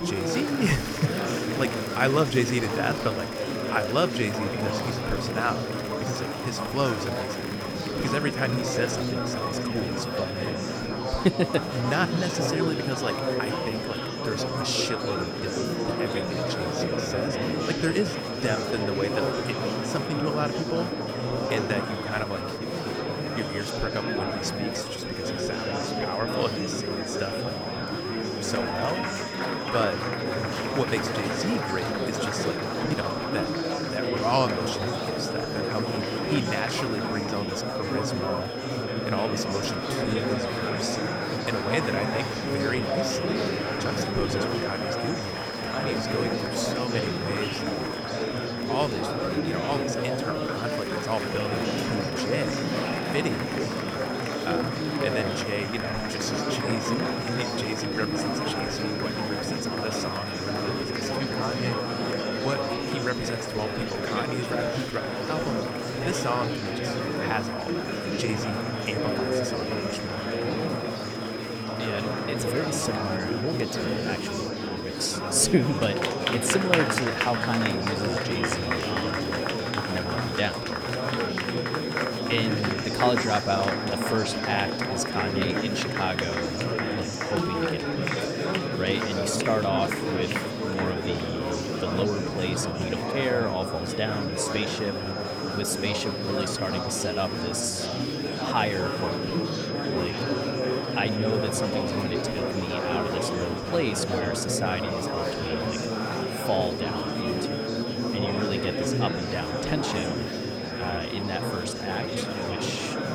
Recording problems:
murmuring crowd; very loud; throughout; 2 dB above the speech
high-pitched whine; loud; throughout; 5 kHz, 8 dB below the speech

